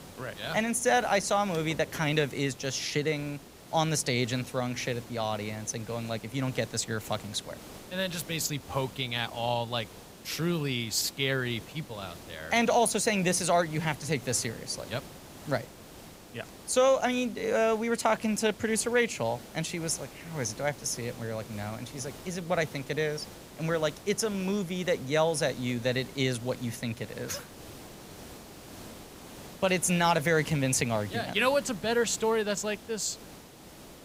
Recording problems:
hiss; noticeable; throughout; 15 dB below the speech

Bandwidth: 15.5 kHz